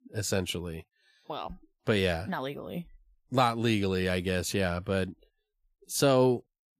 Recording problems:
none

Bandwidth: 14.5 kHz